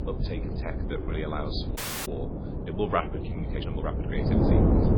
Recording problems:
garbled, watery; badly; nothing above 4.5 kHz
wind noise on the microphone; heavy; 1 dB below the speech
low rumble; noticeable; until 2 s and from 3 s on; 20 dB below the speech
uneven, jittery; slightly; from 0.5 to 4 s
audio cutting out; at 2 s

